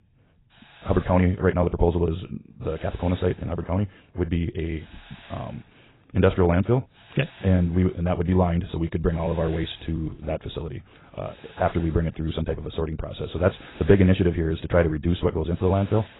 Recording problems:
garbled, watery; badly; nothing above 4 kHz
wrong speed, natural pitch; too fast; 1.7 times normal speed
hiss; faint; throughout; 25 dB below the speech

